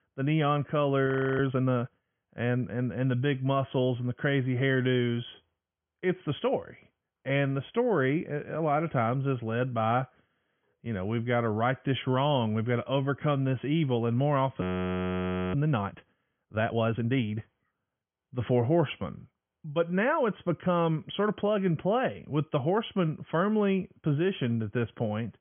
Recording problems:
high frequencies cut off; severe; nothing above 3.5 kHz
audio freezing; at 1 s and at 15 s for 1 s

